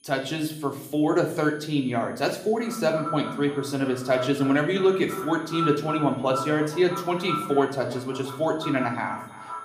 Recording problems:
echo of what is said; strong; from 2.5 s on; 330 ms later, 10 dB below the speech
room echo; slight; dies away in 0.6 s
off-mic speech; somewhat distant
high-pitched whine; faint; throughout; 10 kHz, 30 dB below the speech

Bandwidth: 15 kHz